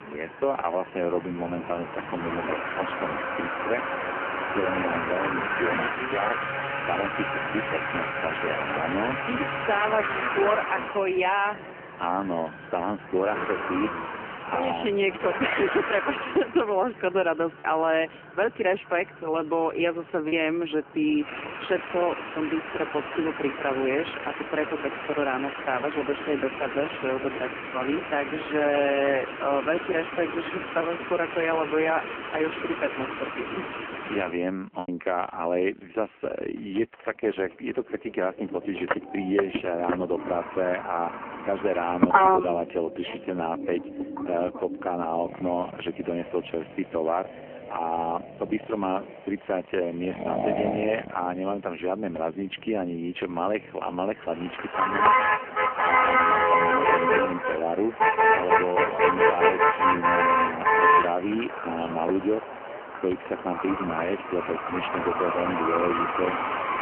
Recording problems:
phone-call audio; poor line; nothing above 3 kHz
traffic noise; very loud; throughout; 1 dB above the speech
choppy; occasionally; from 18 to 20 s and at 35 s; 2% of the speech affected

